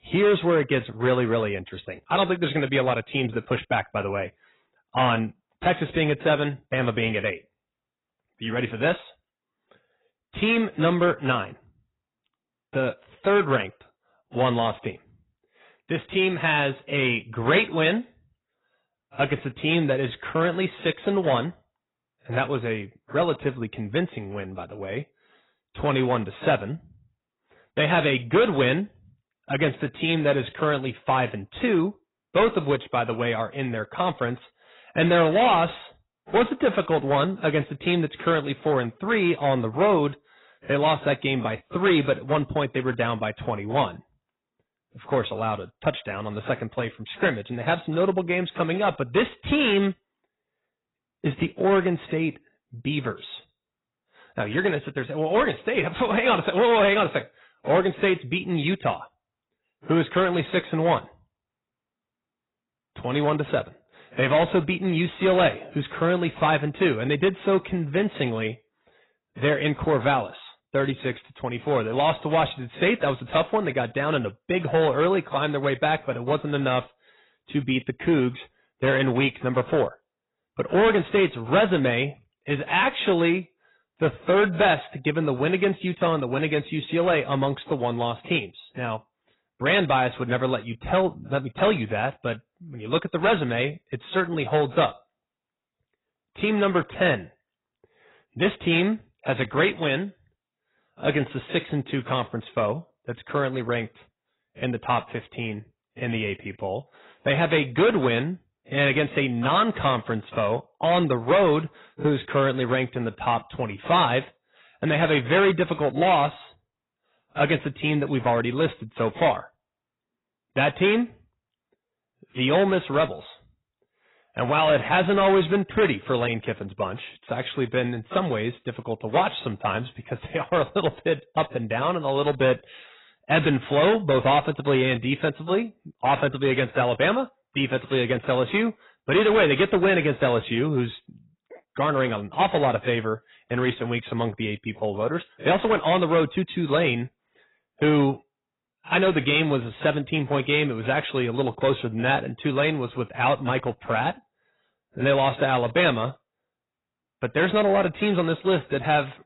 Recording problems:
garbled, watery; badly; nothing above 4 kHz
distortion; slight; 4% of the sound clipped

